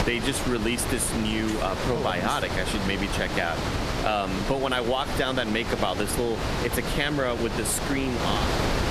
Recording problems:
squashed, flat; somewhat
wind noise on the microphone; heavy; 4 dB below the speech
traffic noise; very faint; throughout; 25 dB below the speech

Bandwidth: 14.5 kHz